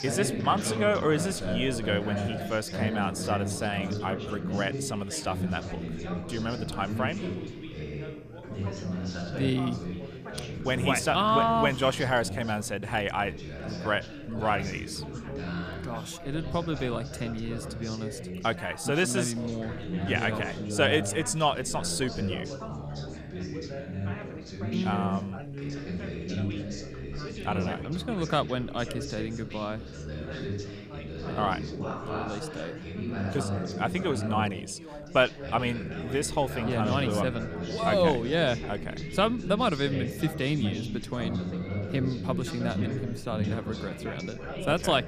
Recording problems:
background chatter; loud; throughout; 3 voices, 6 dB below the speech
animal sounds; faint; throughout; 25 dB below the speech

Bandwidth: 15 kHz